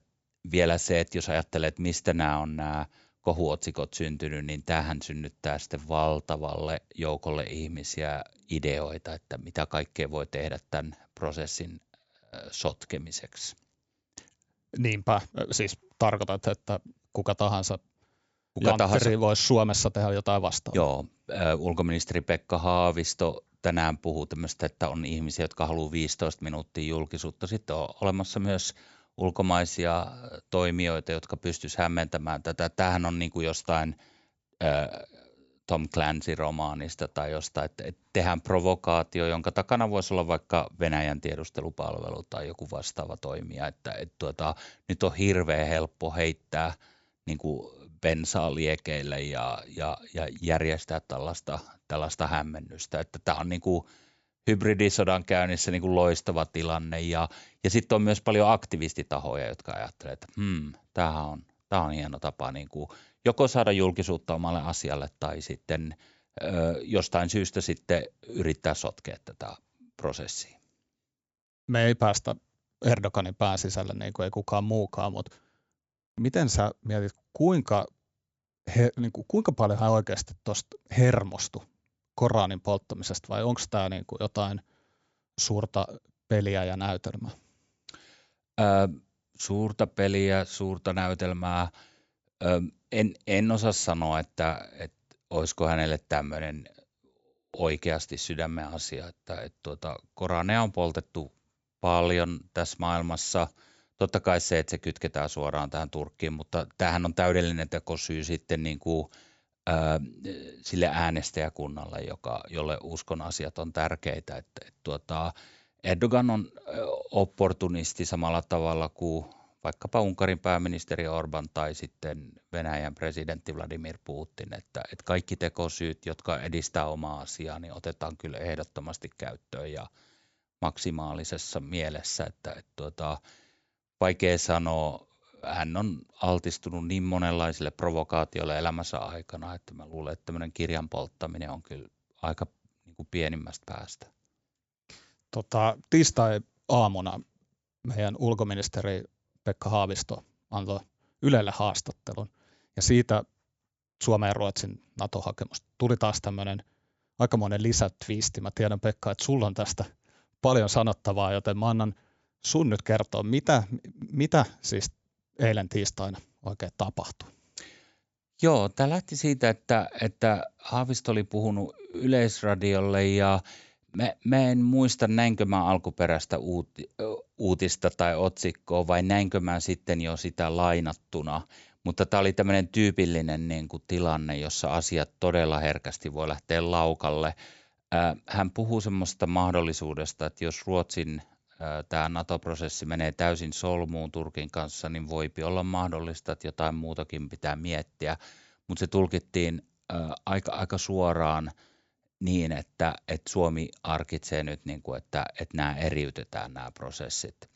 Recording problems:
high frequencies cut off; noticeable; nothing above 8 kHz

